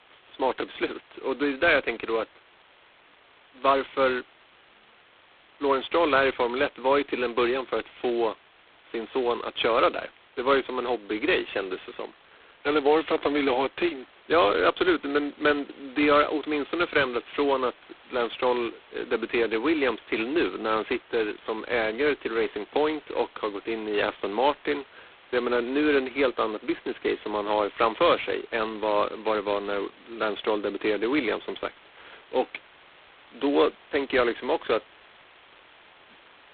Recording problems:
phone-call audio; poor line; nothing above 4 kHz
hiss; faint; throughout; 25 dB below the speech

